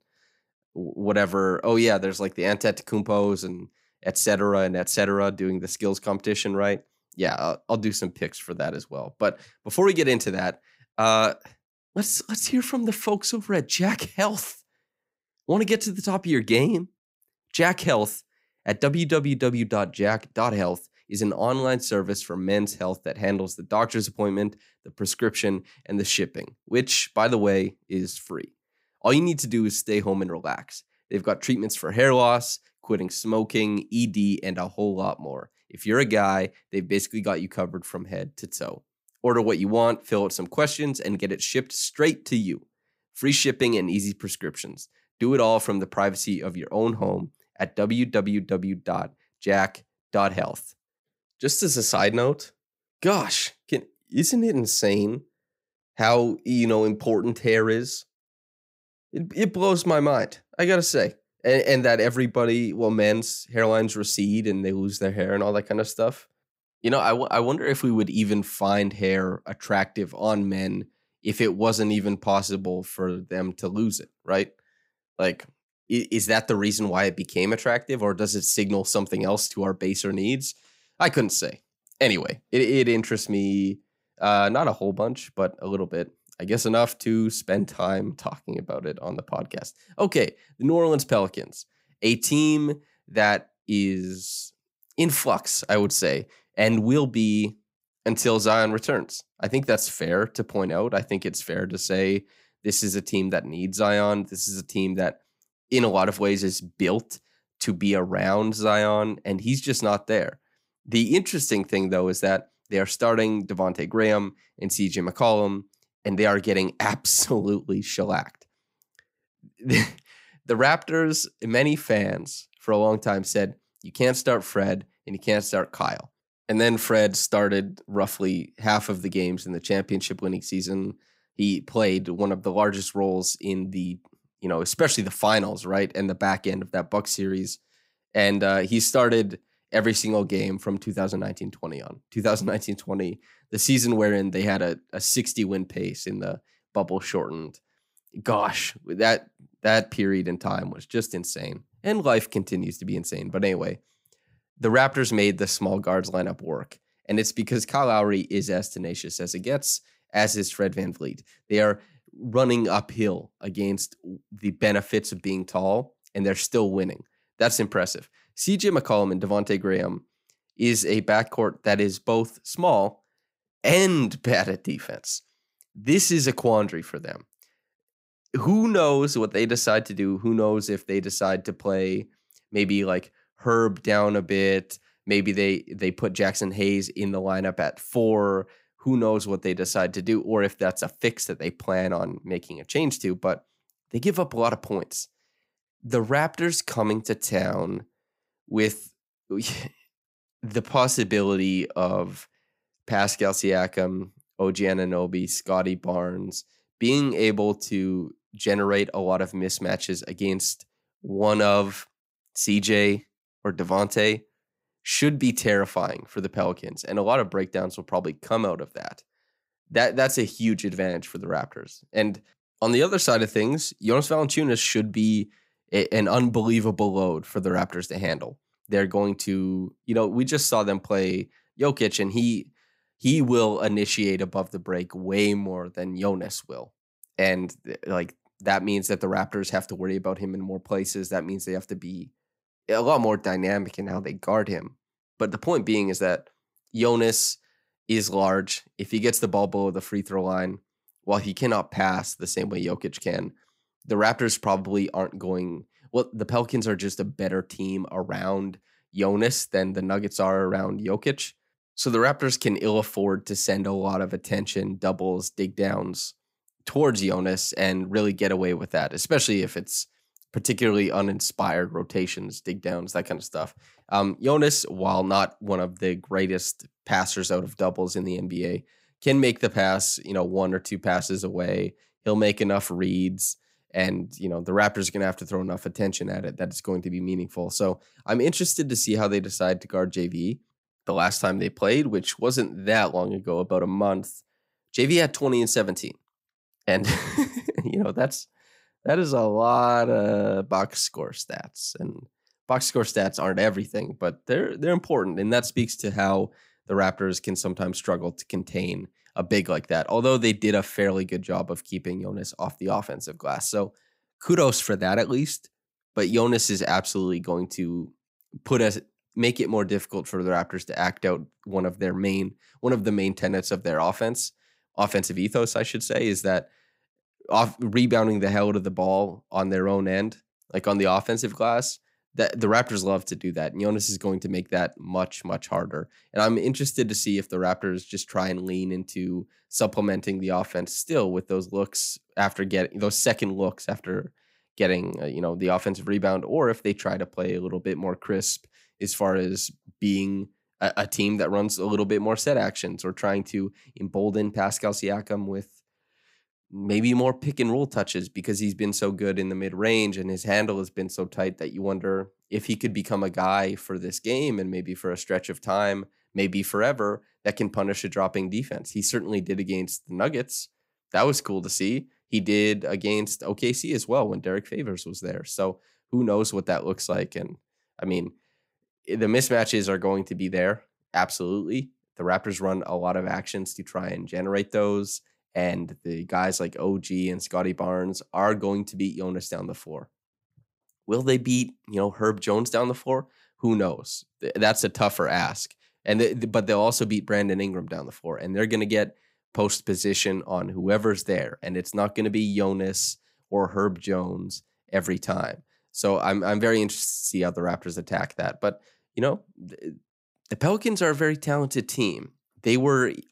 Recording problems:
none

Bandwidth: 15.5 kHz